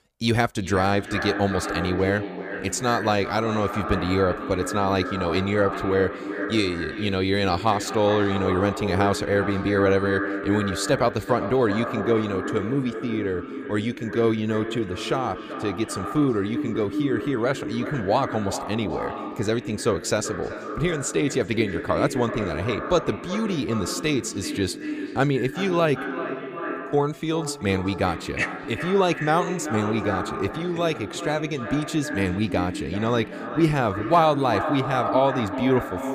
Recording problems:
echo of what is said; strong; throughout; 380 ms later, 7 dB below the speech

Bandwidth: 15 kHz